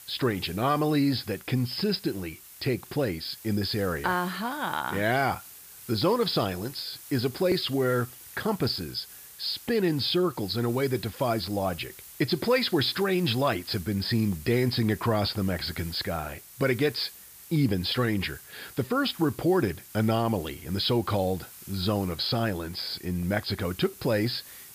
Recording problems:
high frequencies cut off; noticeable; nothing above 5.5 kHz
hiss; noticeable; throughout; 15 dB below the speech

